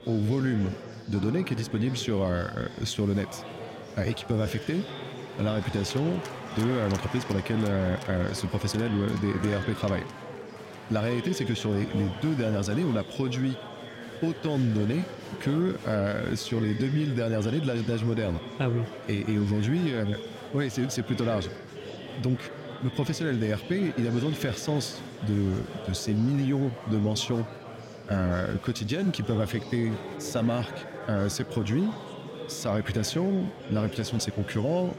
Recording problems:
chatter from many people; noticeable; throughout; 10 dB below the speech

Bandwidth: 16 kHz